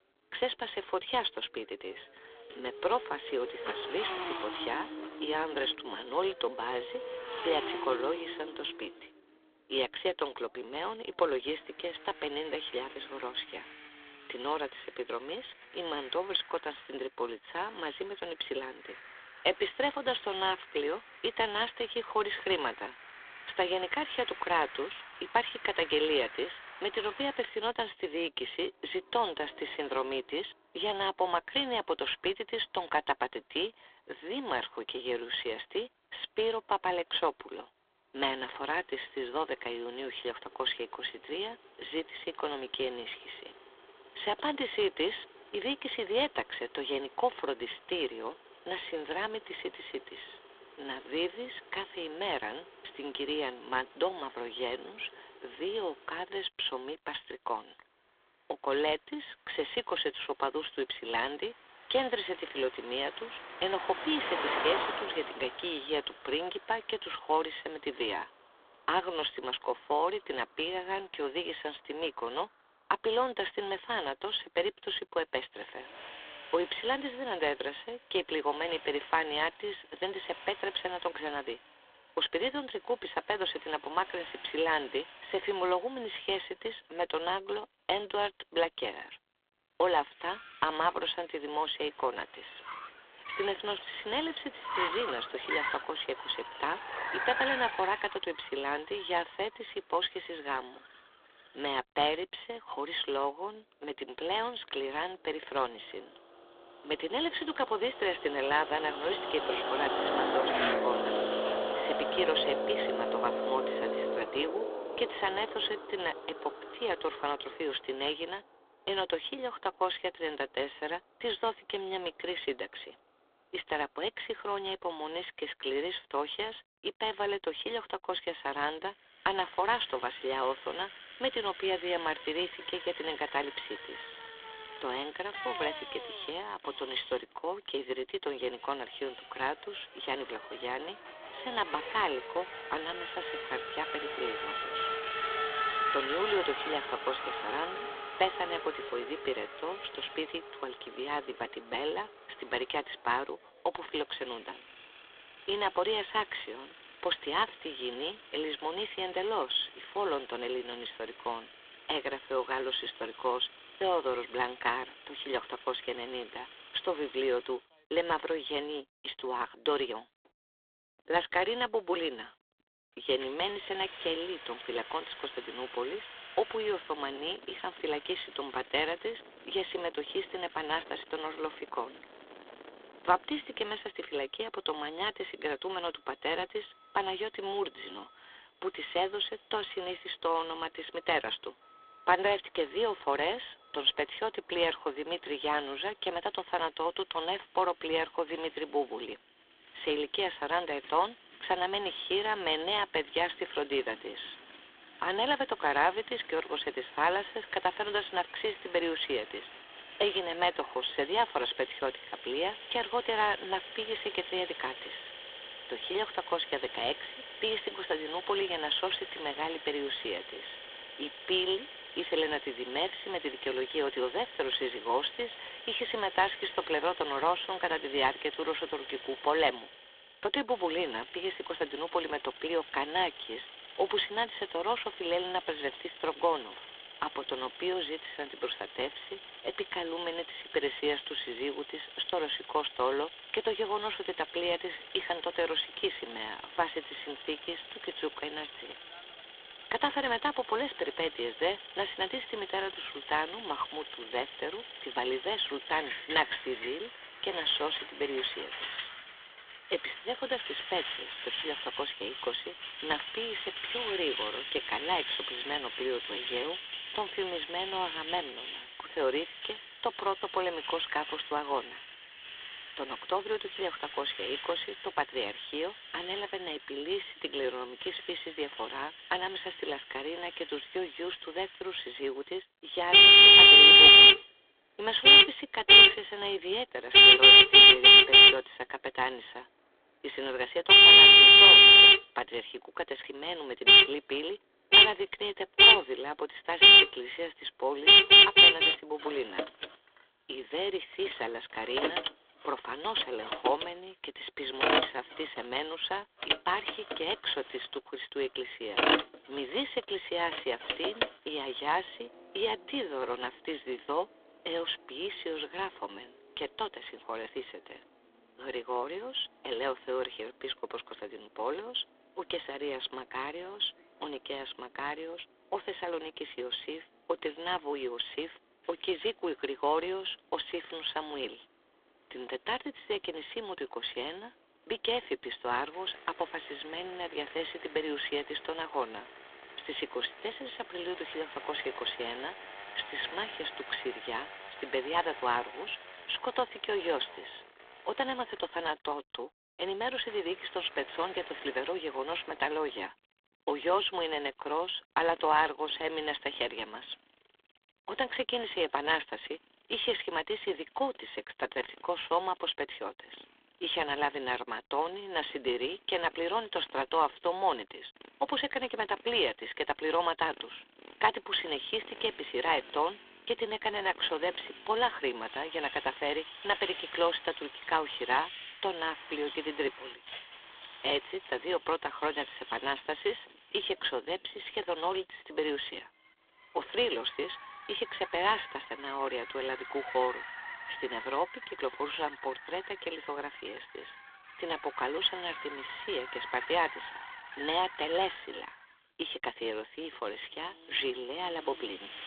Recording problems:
phone-call audio; poor line
thin; very; fading below 300 Hz
traffic noise; very loud; throughout; 15 dB above the speech

